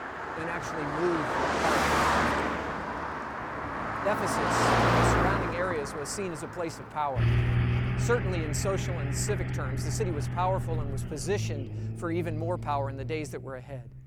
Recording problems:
traffic noise; very loud; throughout; 4 dB above the speech

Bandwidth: 18.5 kHz